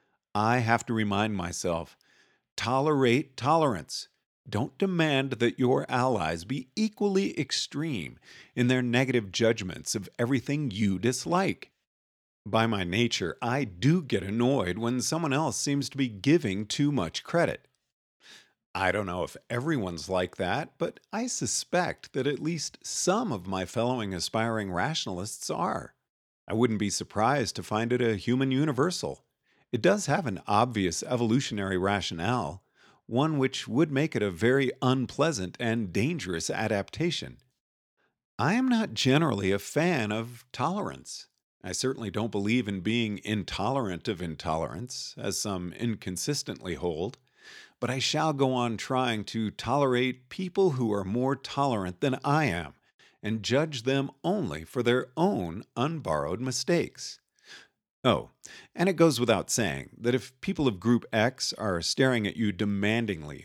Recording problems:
none

